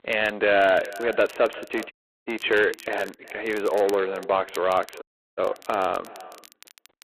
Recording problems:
phone-call audio; poor line; nothing above 3.5 kHz
echo of what is said; noticeable; throughout; 370 ms later, 20 dB below the speech
distortion; slight; 15 dB below the speech
crackle, like an old record; faint; 25 dB below the speech
audio cutting out; at 2 s and at 5 s

